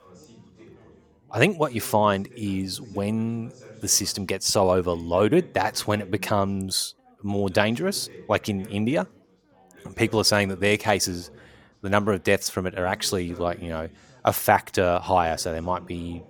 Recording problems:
background chatter; faint; throughout; 4 voices, 25 dB below the speech

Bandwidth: 17.5 kHz